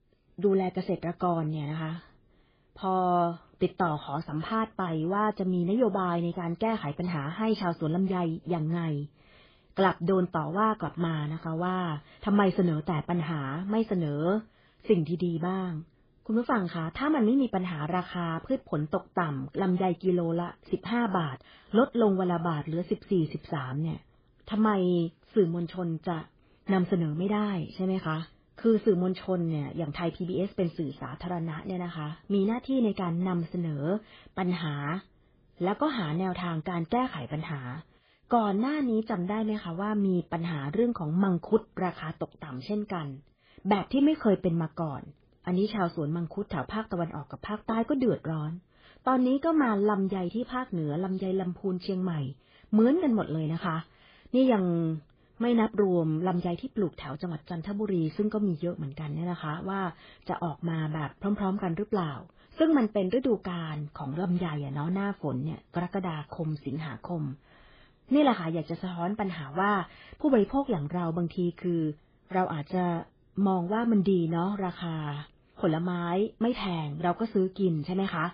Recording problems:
garbled, watery; badly

